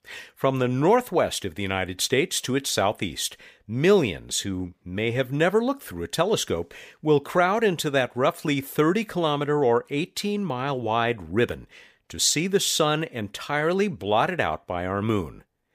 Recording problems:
none

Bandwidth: 15 kHz